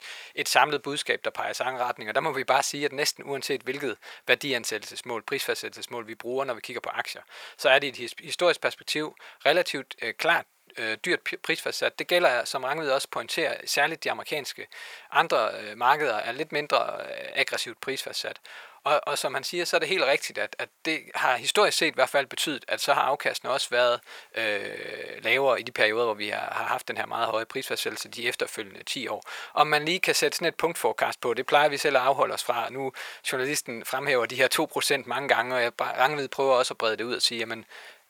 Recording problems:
thin; very; fading below 750 Hz

